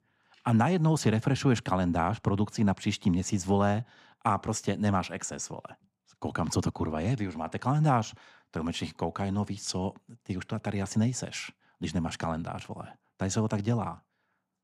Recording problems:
none

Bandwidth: 14.5 kHz